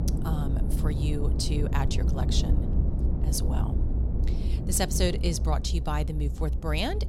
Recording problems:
low rumble; loud; throughout; 8 dB below the speech

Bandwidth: 16 kHz